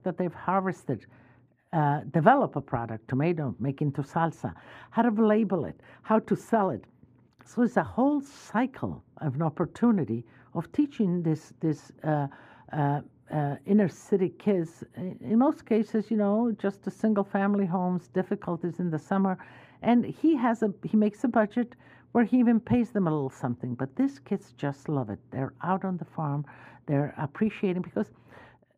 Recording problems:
muffled; very; fading above 3 kHz

